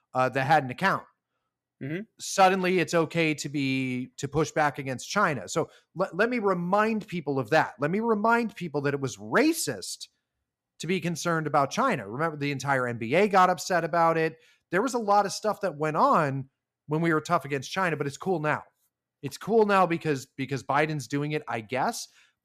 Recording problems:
none

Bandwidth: 14.5 kHz